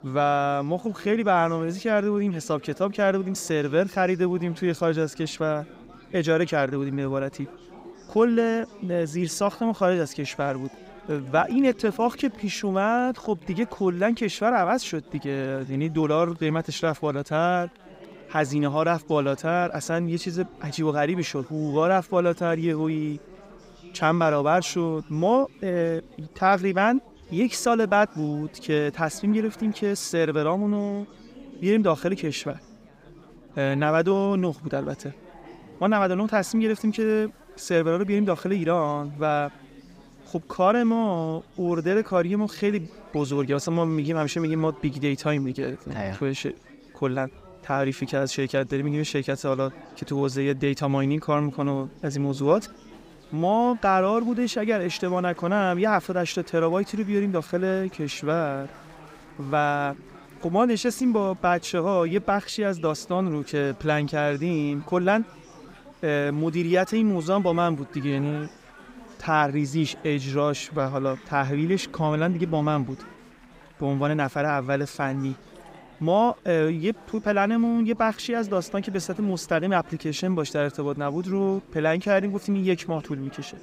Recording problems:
chatter from many people; faint; throughout; 20 dB below the speech

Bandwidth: 15.5 kHz